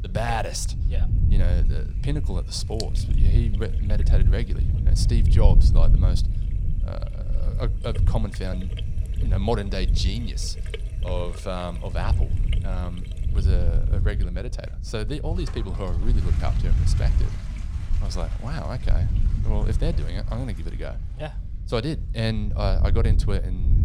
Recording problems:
low rumble; loud; throughout; 9 dB below the speech
household noises; noticeable; throughout; 15 dB below the speech

